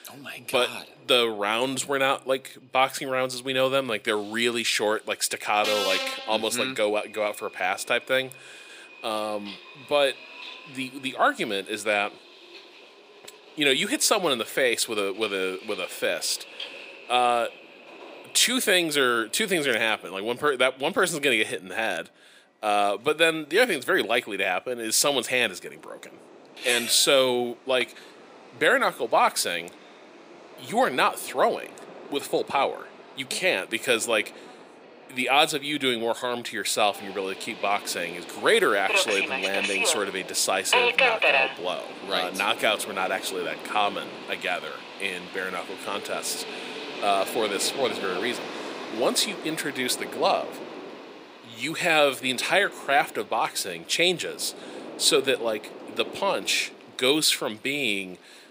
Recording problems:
thin; somewhat; fading below 300 Hz
train or aircraft noise; loud; throughout; 7 dB below the speech

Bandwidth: 15.5 kHz